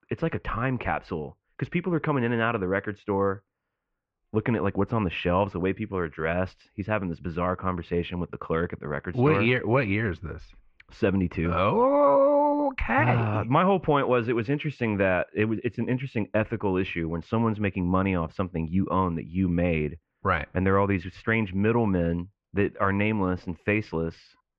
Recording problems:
muffled; very; fading above 2.5 kHz

